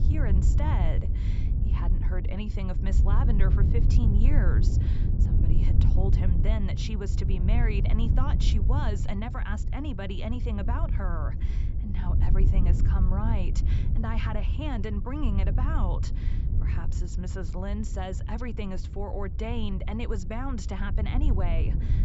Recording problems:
high frequencies cut off; noticeable; nothing above 8 kHz
wind noise on the microphone; heavy; 5 dB below the speech

